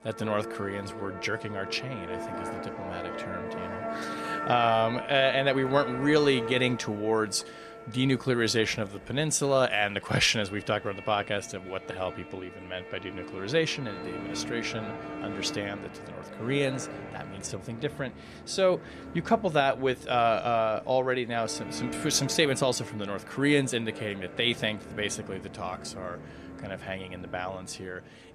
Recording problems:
background music; noticeable; throughout; 10 dB below the speech

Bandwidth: 14 kHz